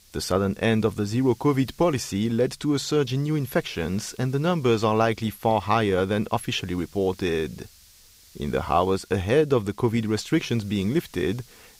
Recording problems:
hiss; faint; throughout; 25 dB below the speech

